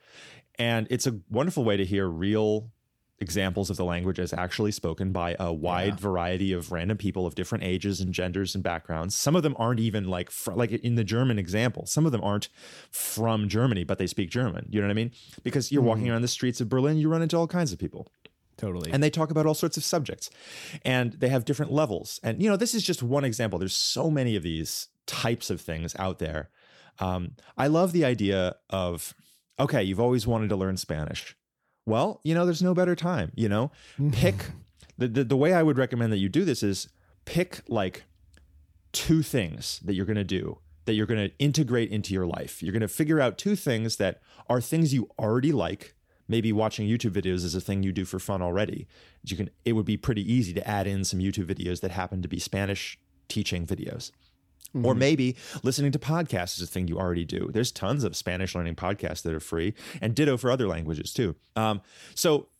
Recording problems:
none

